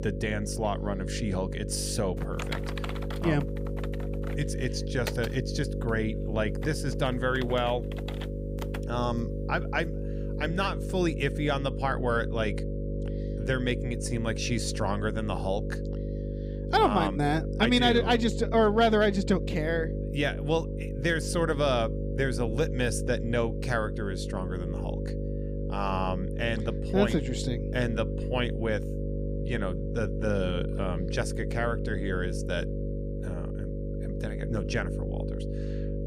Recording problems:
electrical hum; loud; throughout; 50 Hz, 10 dB below the speech
keyboard typing; noticeable; from 2 to 9 s; peak 8 dB below the speech

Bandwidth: 15.5 kHz